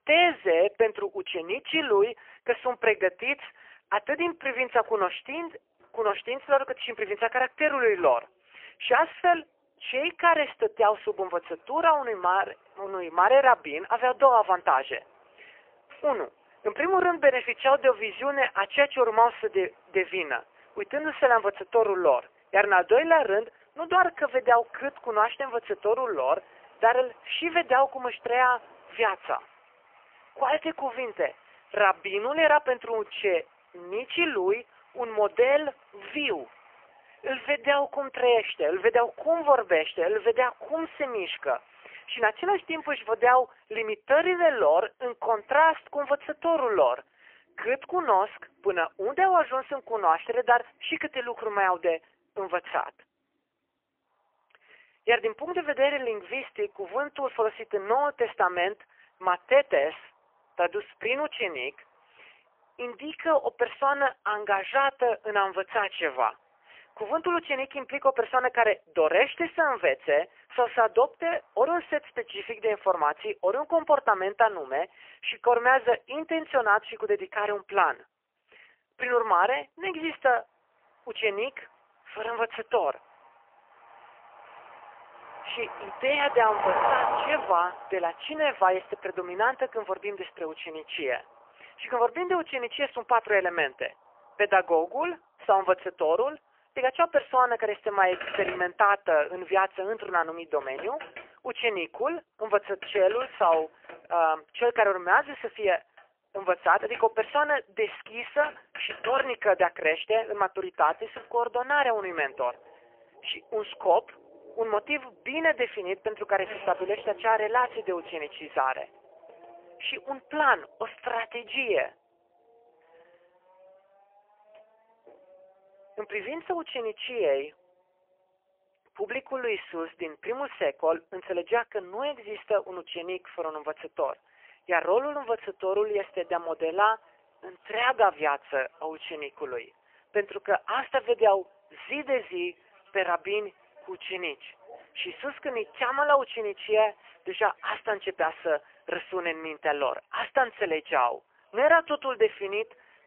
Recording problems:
phone-call audio; poor line; nothing above 3 kHz
traffic noise; noticeable; throughout; 15 dB below the speech

